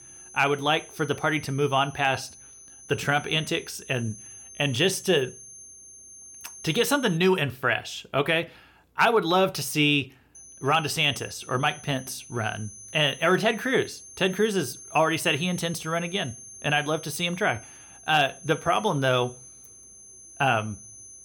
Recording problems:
high-pitched whine; noticeable; until 7 s and from 10 s on; 6.5 kHz, 20 dB below the speech

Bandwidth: 17.5 kHz